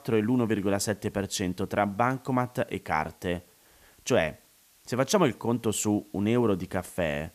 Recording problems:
hiss; faint; throughout; 30 dB below the speech

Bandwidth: 14.5 kHz